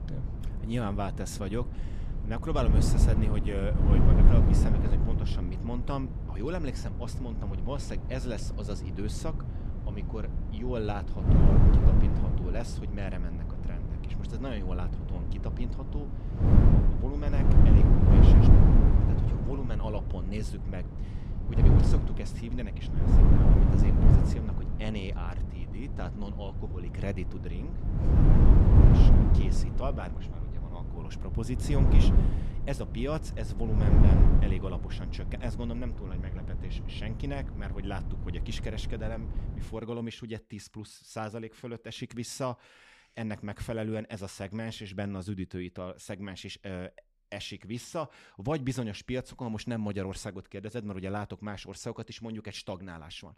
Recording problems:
wind noise on the microphone; heavy; until 40 s; 3 dB above the speech

